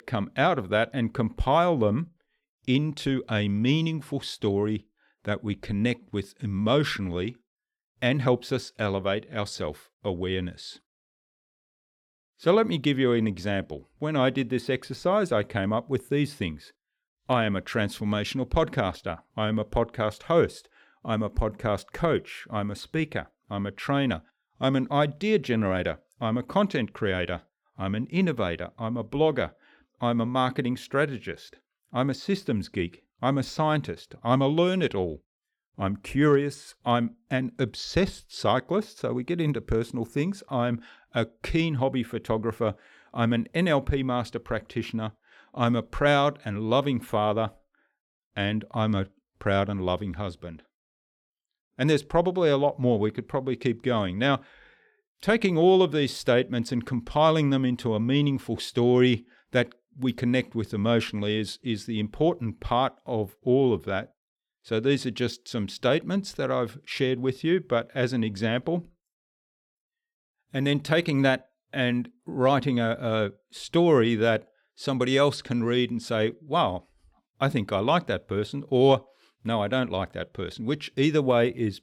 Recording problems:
none

